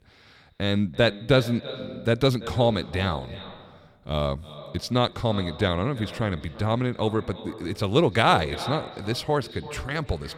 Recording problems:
echo of what is said; noticeable; throughout; 340 ms later, 15 dB below the speech

